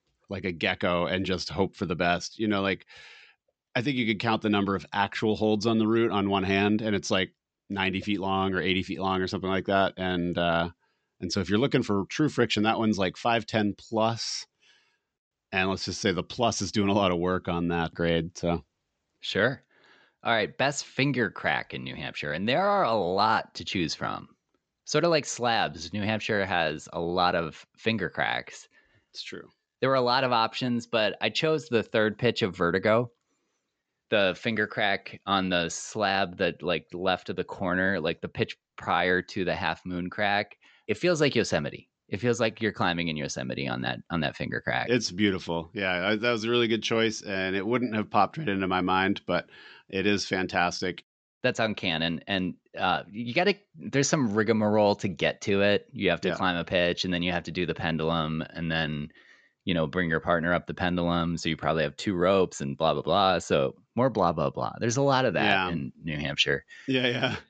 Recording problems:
high frequencies cut off; noticeable; nothing above 8 kHz

